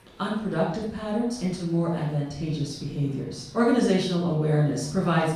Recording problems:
off-mic speech; far
room echo; noticeable; dies away in 0.6 s
chatter from many people; faint; throughout; 25 dB below the speech

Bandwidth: 15 kHz